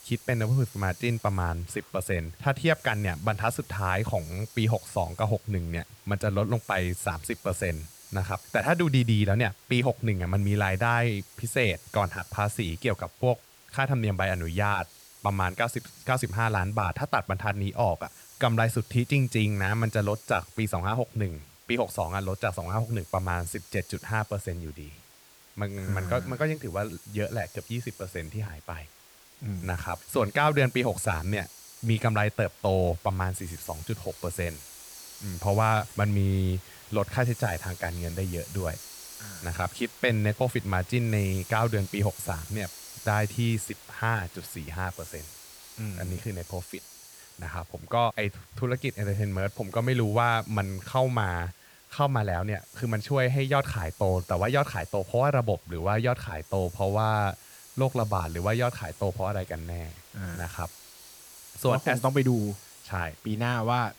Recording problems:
hiss; noticeable; throughout; 20 dB below the speech

